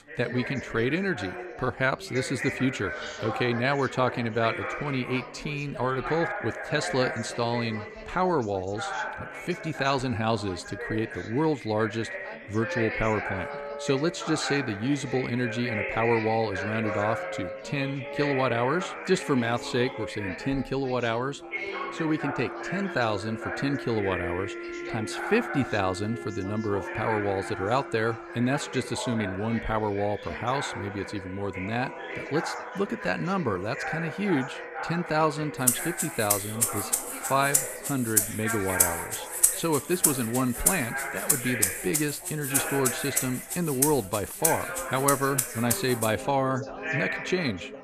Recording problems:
background music; loud; from 13 s on; 1 dB below the speech
background chatter; loud; throughout; 3 voices, 7 dB below the speech

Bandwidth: 14.5 kHz